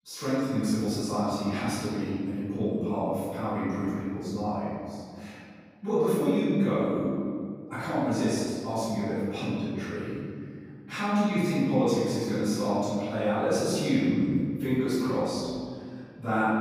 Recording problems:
room echo; strong; dies away in 2 s
off-mic speech; far

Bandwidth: 15.5 kHz